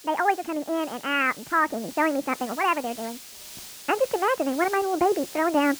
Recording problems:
high frequencies cut off; severe; nothing above 3 kHz
wrong speed and pitch; too fast and too high; 1.5 times normal speed
hiss; noticeable; throughout; 15 dB below the speech

